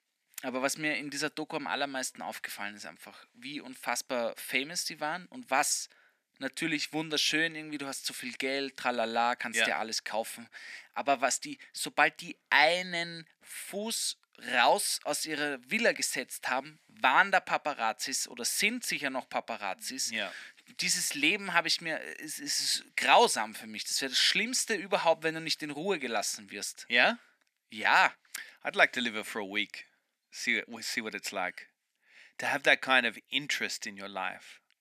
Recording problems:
thin; somewhat; fading below 300 Hz

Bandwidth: 14.5 kHz